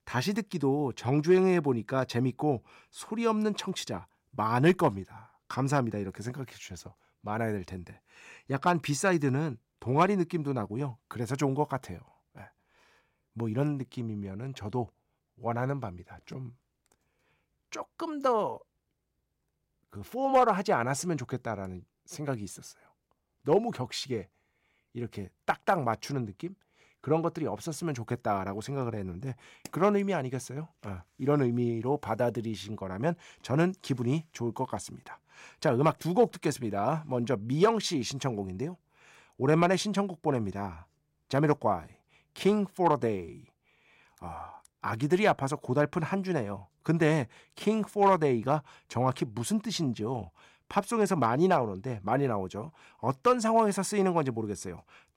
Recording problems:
none

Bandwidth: 16 kHz